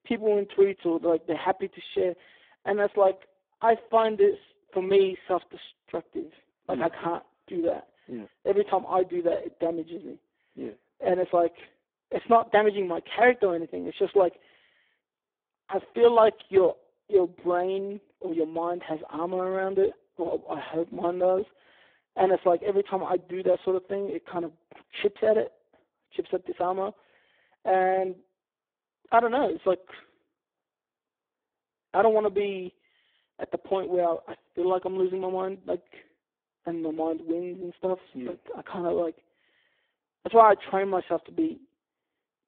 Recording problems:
phone-call audio; poor line

